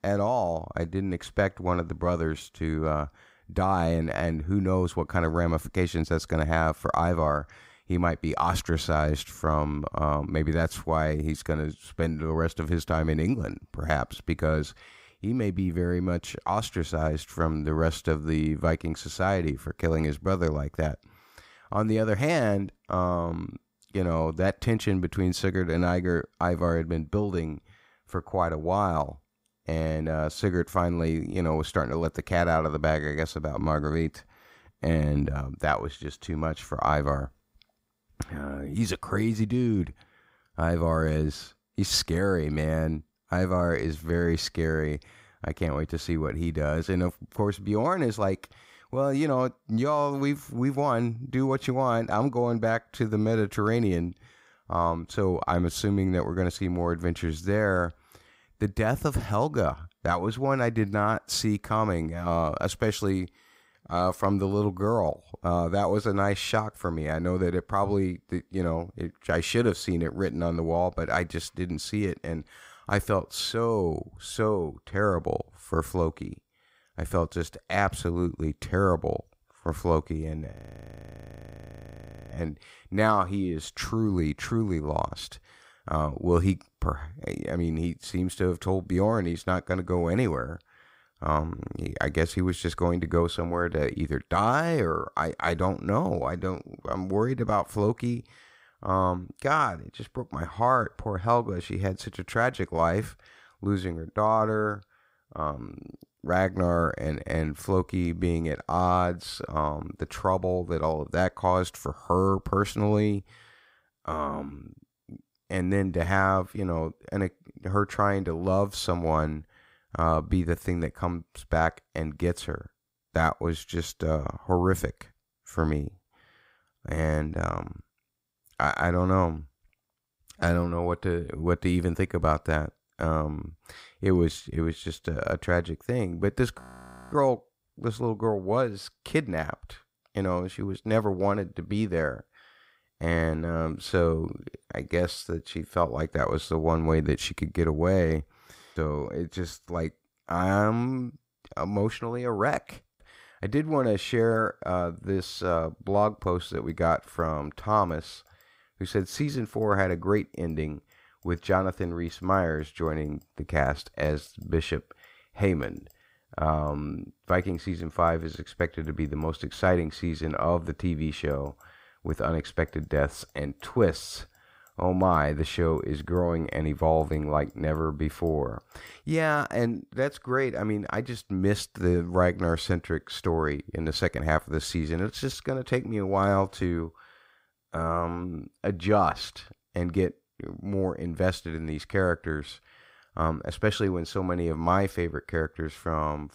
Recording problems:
audio freezing; at 1:21 for 2 s and at 2:17 for 0.5 s

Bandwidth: 15.5 kHz